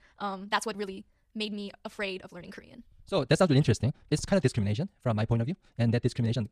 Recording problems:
wrong speed, natural pitch; too fast; 1.7 times normal speed

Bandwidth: 14.5 kHz